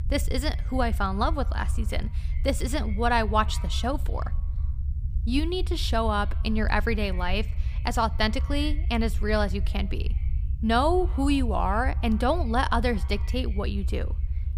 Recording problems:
echo of what is said; faint; throughout; 110 ms later, 25 dB below the speech
low rumble; faint; throughout; 20 dB below the speech

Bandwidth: 15 kHz